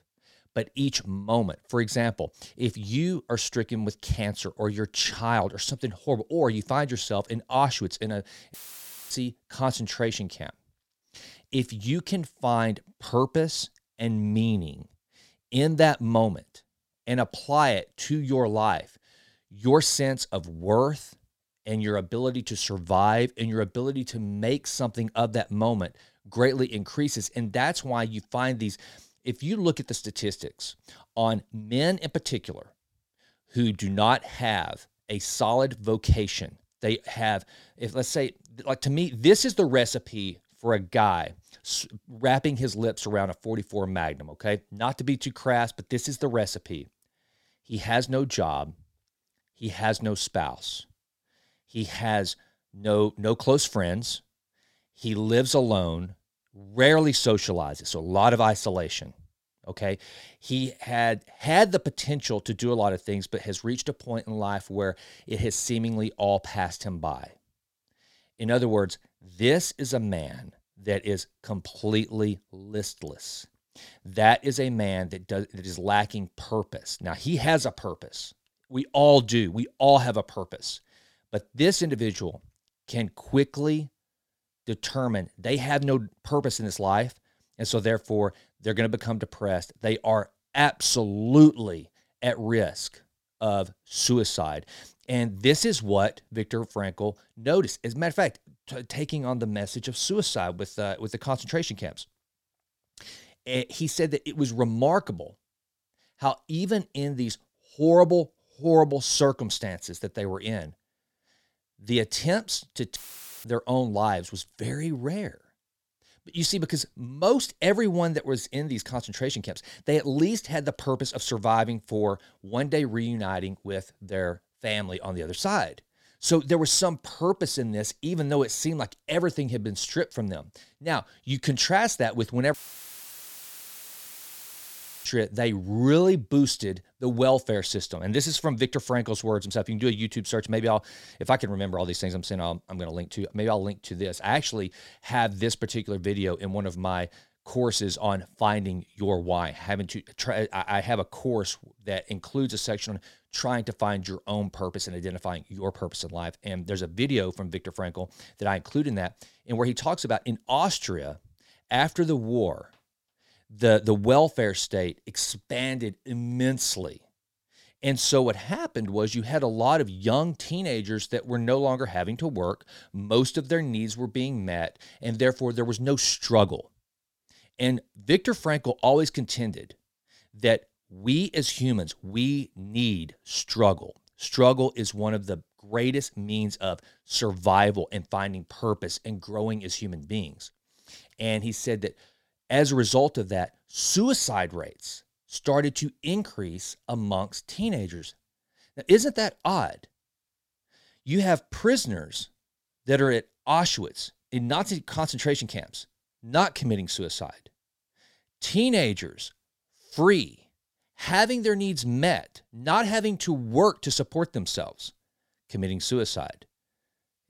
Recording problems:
audio cutting out; filled with static; at 8.5 s for 0.5 s, at 1:53 and at 2:13 for 2.5 s

